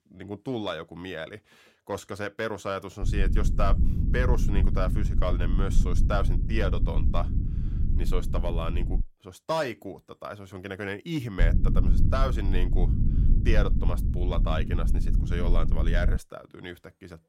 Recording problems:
low rumble; loud; from 3 to 9 s and from 11 to 16 s; 8 dB below the speech

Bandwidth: 16 kHz